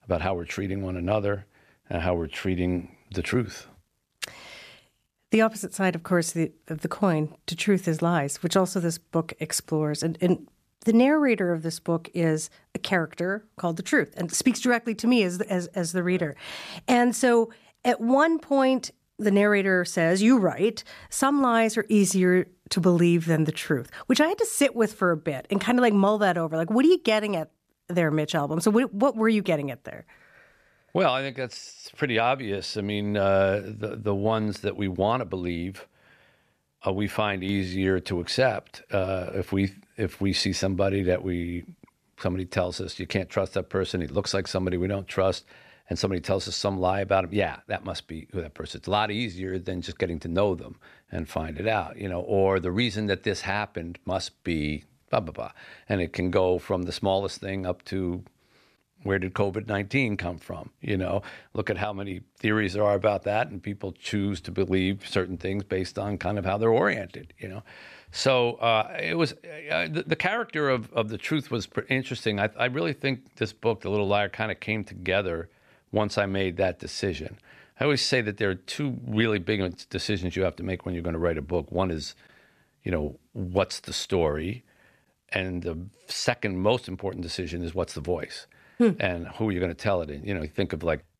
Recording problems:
none

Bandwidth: 14 kHz